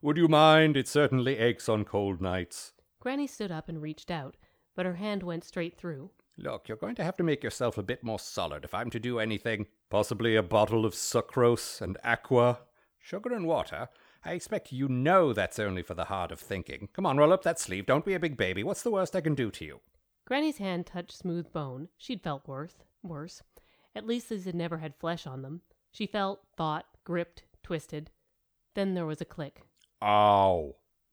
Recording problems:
none

